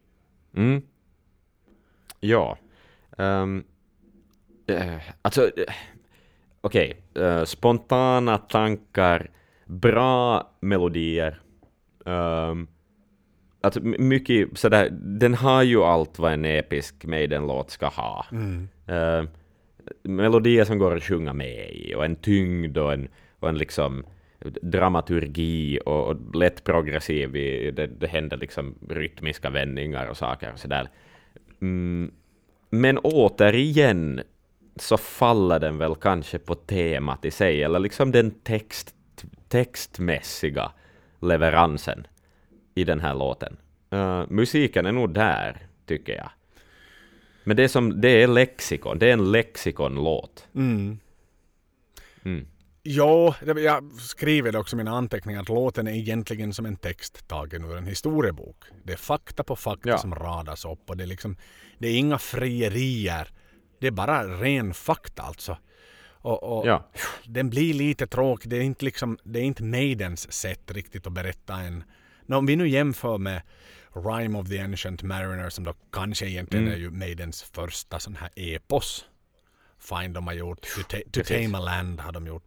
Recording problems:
none

